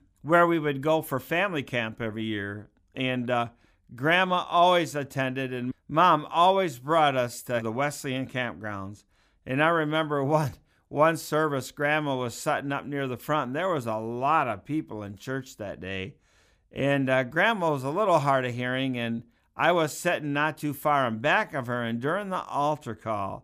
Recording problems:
none

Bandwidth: 15 kHz